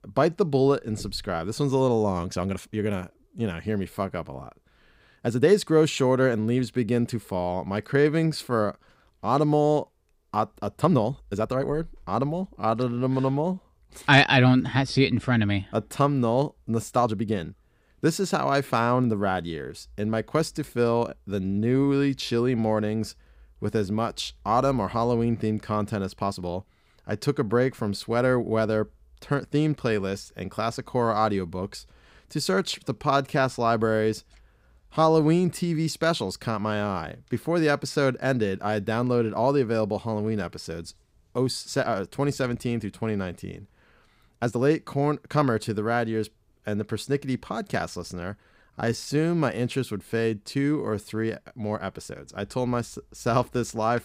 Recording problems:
uneven, jittery; strongly; from 2 to 52 s

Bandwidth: 15.5 kHz